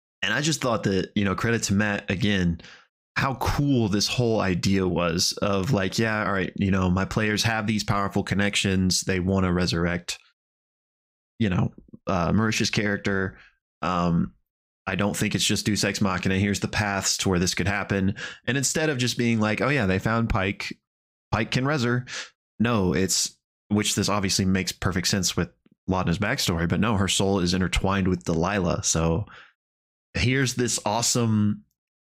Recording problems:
squashed, flat; somewhat

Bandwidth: 15.5 kHz